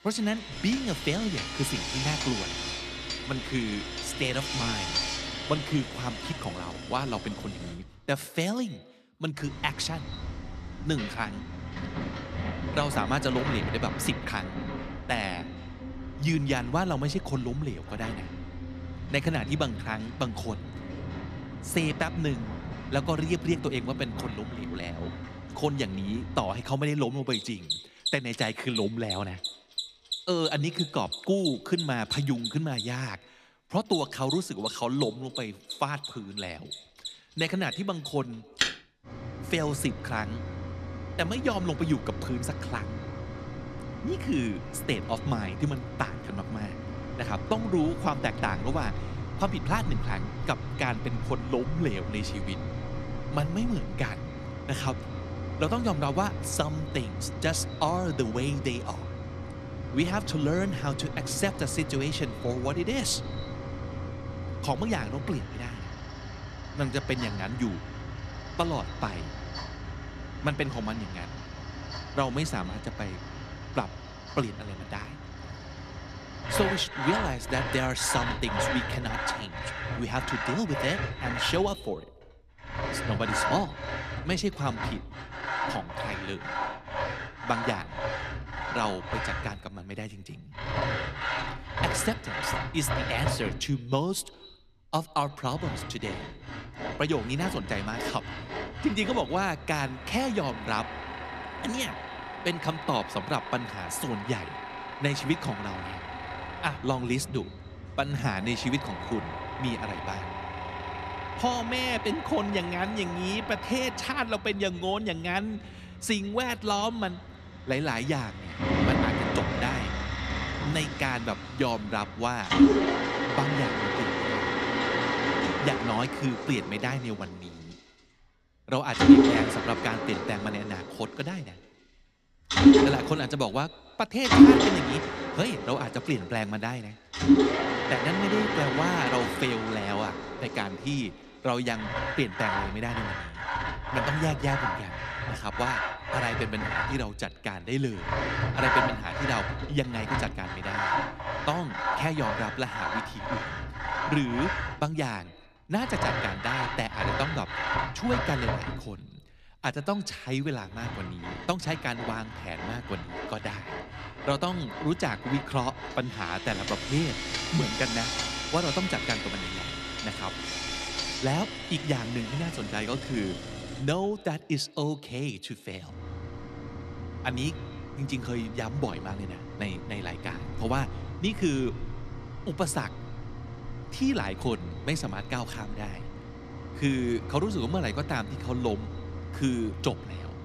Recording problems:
echo of what is said; faint; throughout; 130 ms later, 20 dB below the speech
machinery noise; loud; throughout; as loud as the speech

